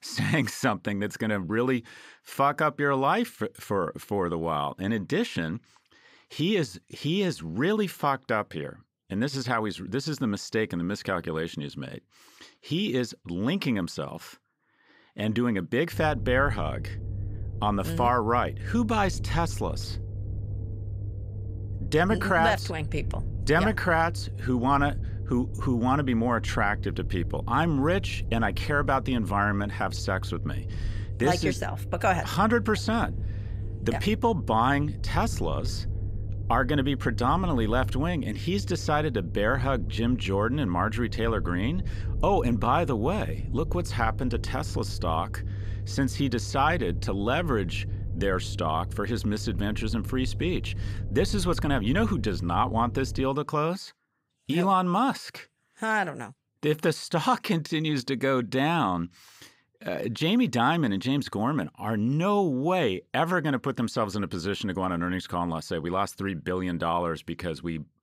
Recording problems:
low rumble; faint; from 16 to 53 s; 20 dB below the speech

